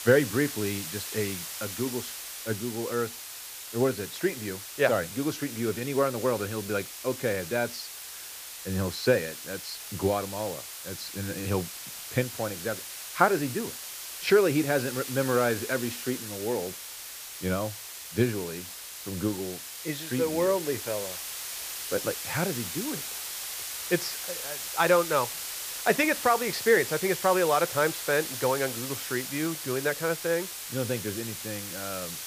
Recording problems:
muffled; very slightly; fading above 3.5 kHz
hiss; loud; throughout; 7 dB below the speech

